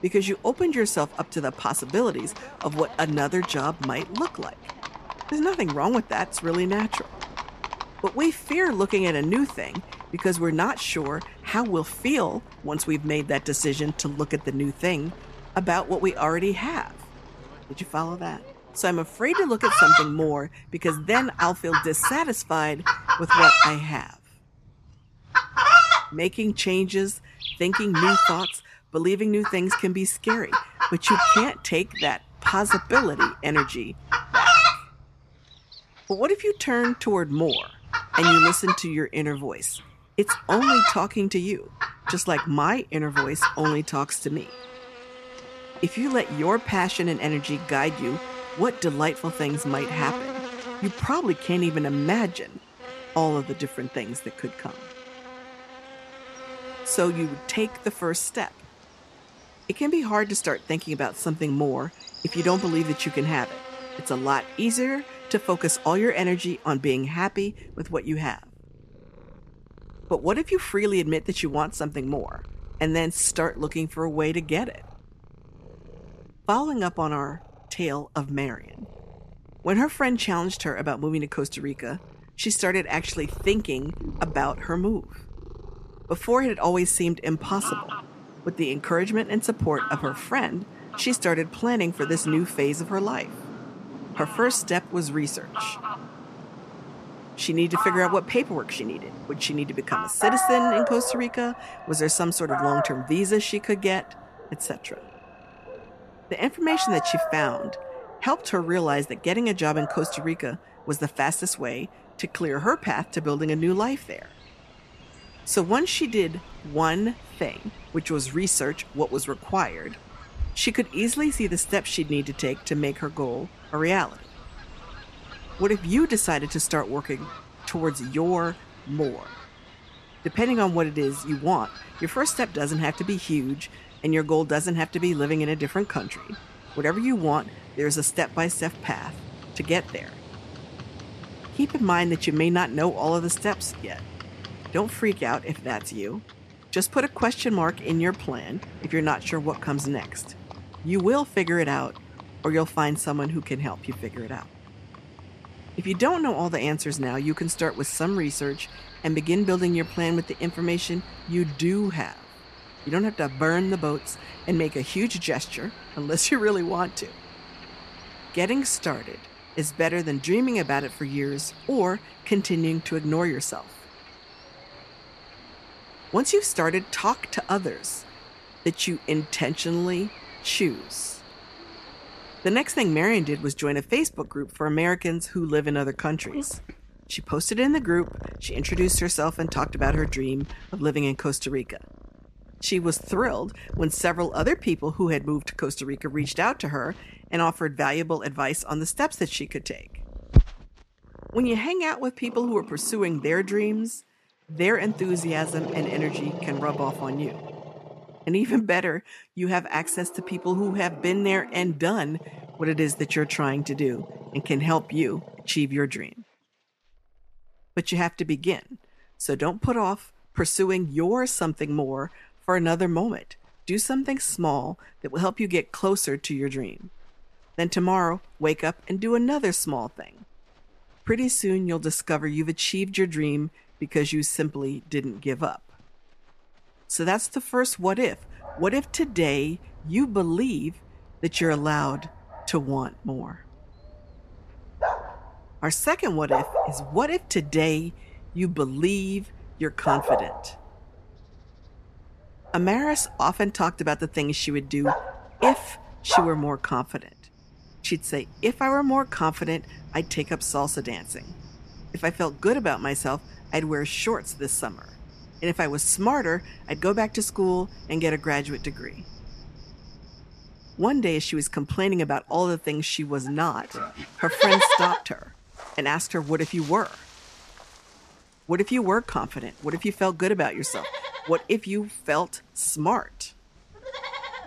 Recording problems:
animal sounds; loud; throughout; 1 dB below the speech

